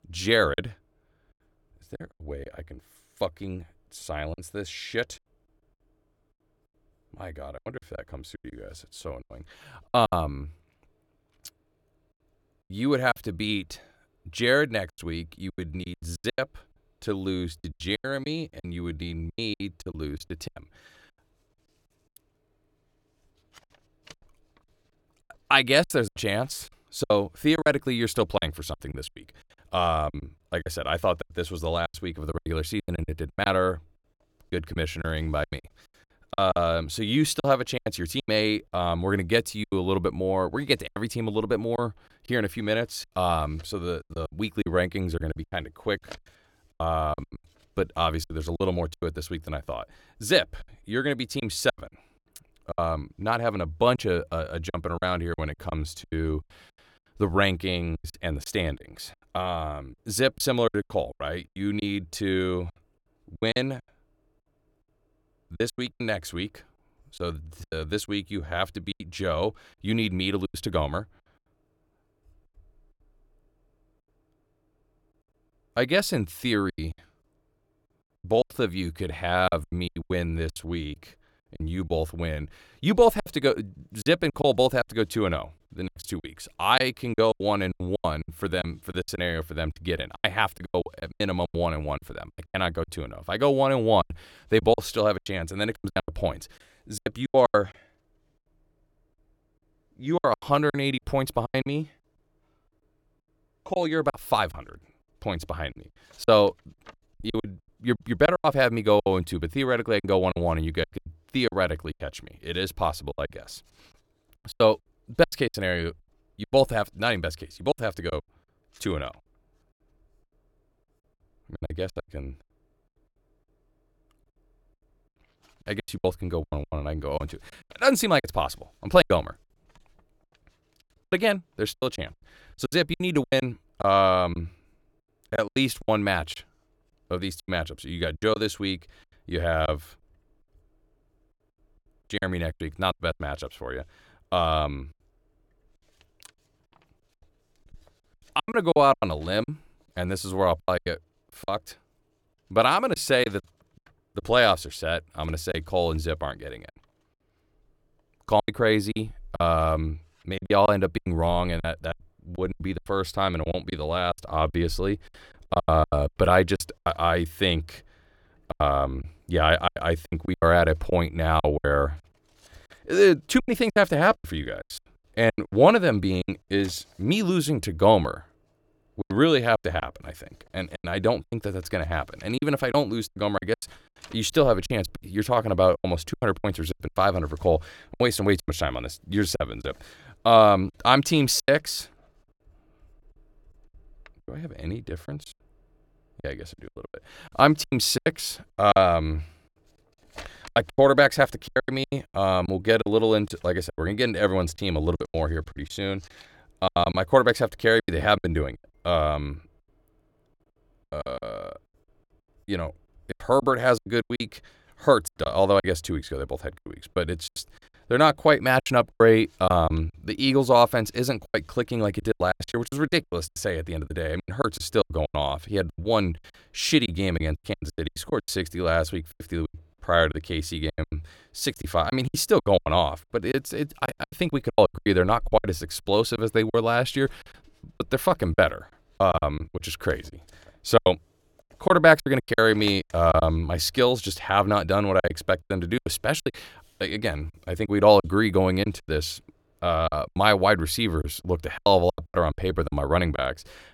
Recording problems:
choppy; very; 14% of the speech affected

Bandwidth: 17.5 kHz